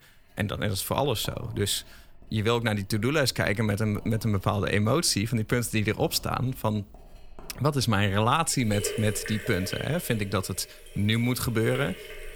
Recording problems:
household noises; noticeable; throughout; 15 dB below the speech

